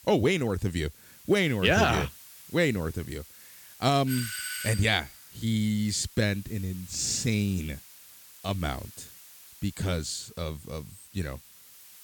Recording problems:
hiss; noticeable; throughout; 20 dB below the speech
doorbell; noticeable; at 4 s; peak 4 dB below the speech

